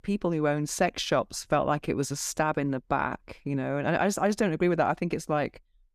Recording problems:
none

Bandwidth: 14.5 kHz